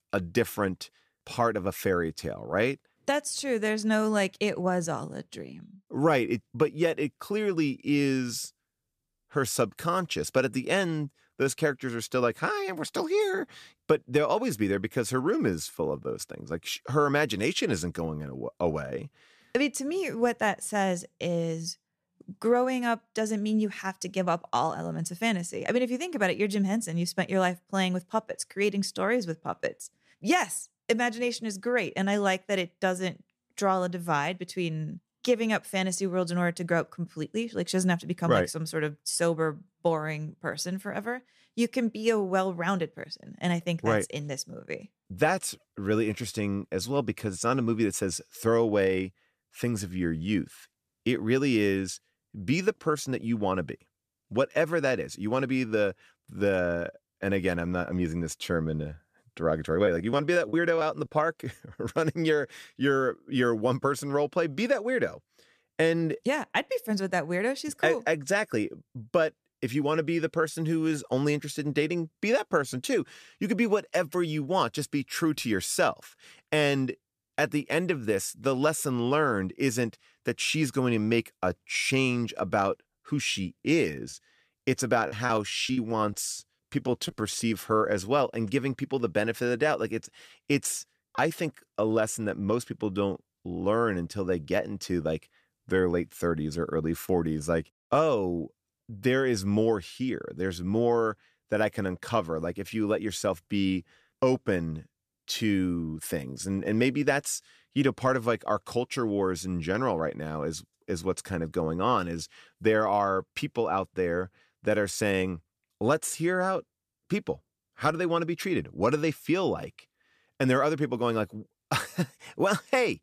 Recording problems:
choppy; very; from 1:00 to 1:01 and from 1:24 to 1:27; 12% of the speech affected

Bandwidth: 14.5 kHz